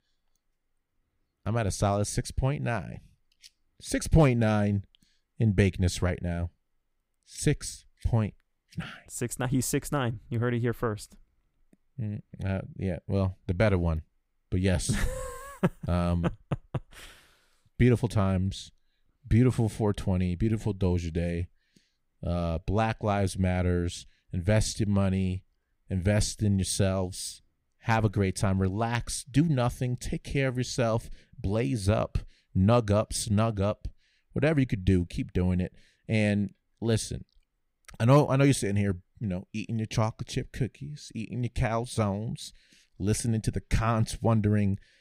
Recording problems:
none

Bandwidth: 15.5 kHz